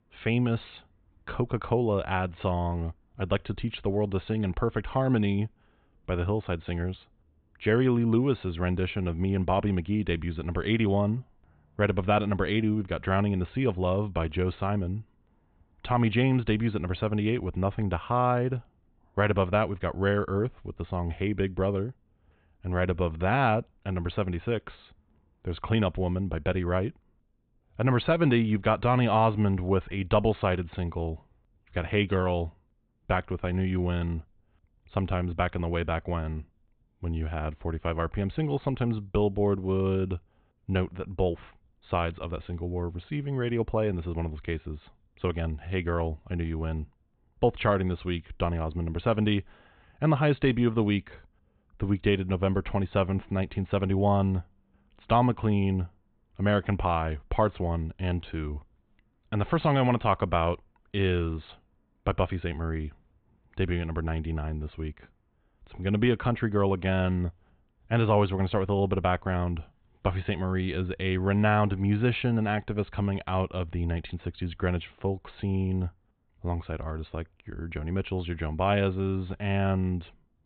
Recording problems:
high frequencies cut off; severe; nothing above 4 kHz

